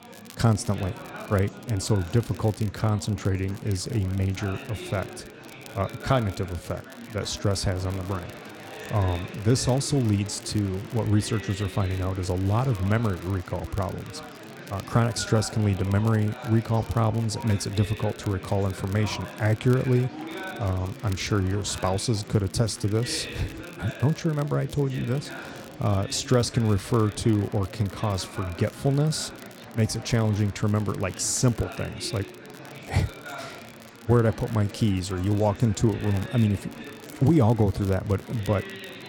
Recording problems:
chatter from many people; noticeable; throughout; 15 dB below the speech
crackle, like an old record; faint; 25 dB below the speech

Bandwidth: 17 kHz